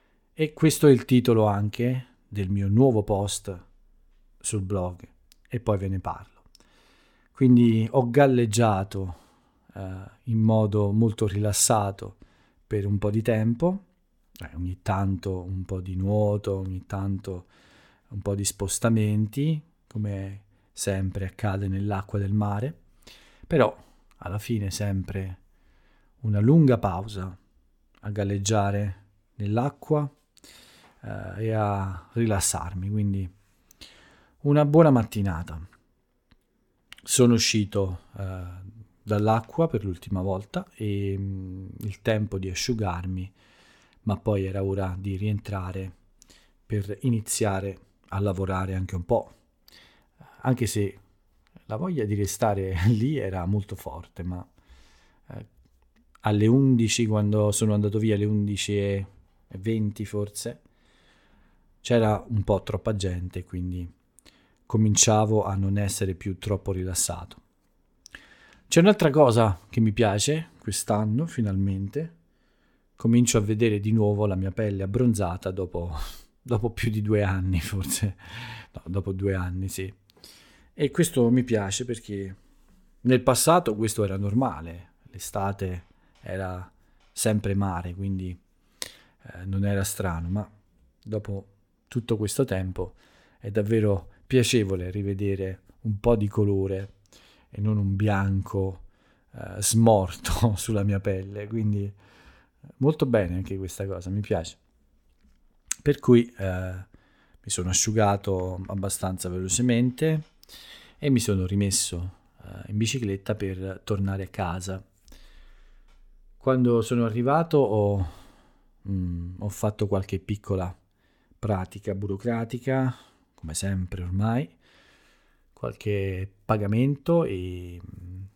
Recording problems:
none

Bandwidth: 17.5 kHz